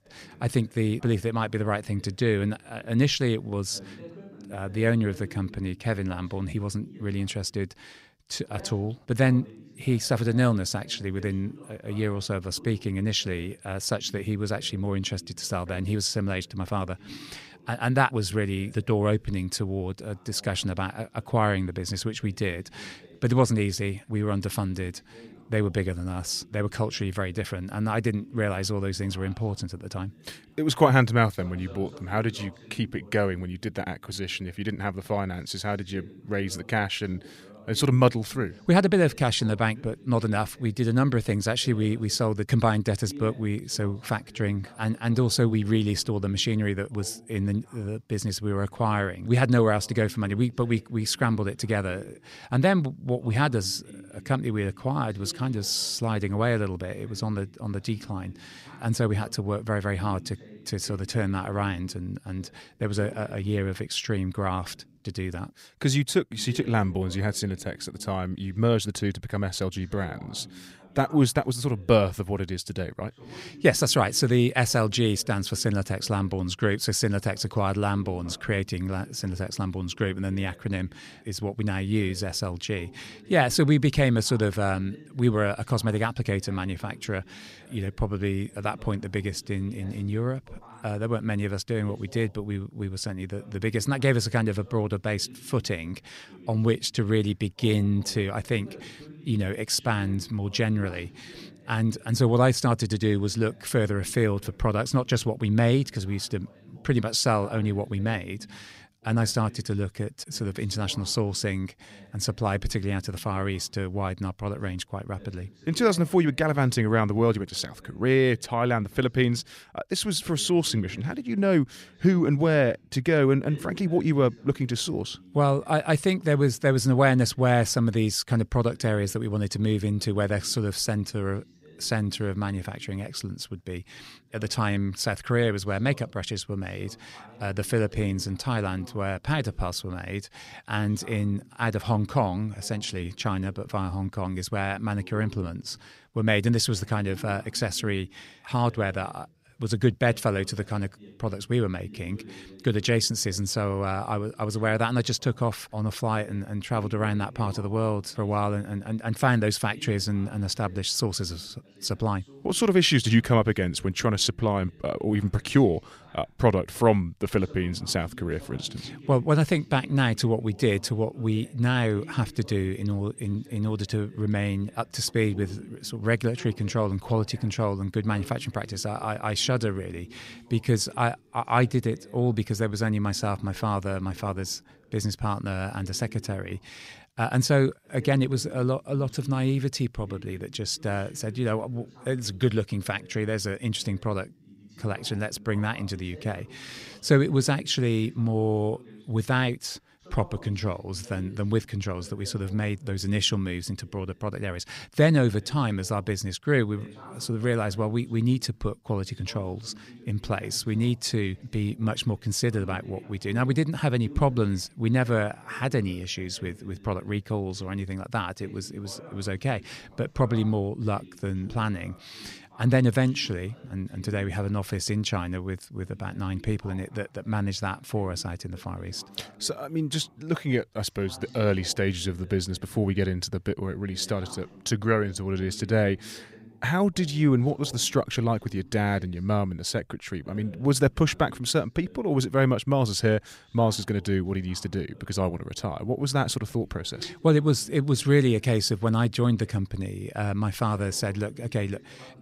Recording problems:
voice in the background; faint; throughout; 25 dB below the speech

